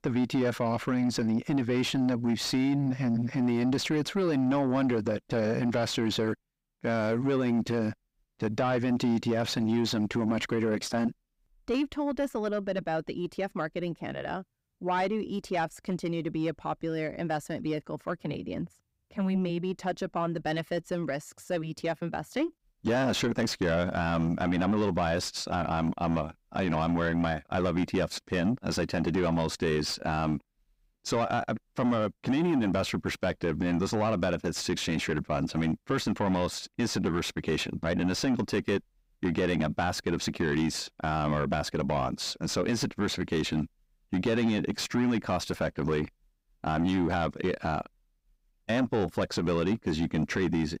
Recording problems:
distortion; slight; 10 dB below the speech

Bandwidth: 15.5 kHz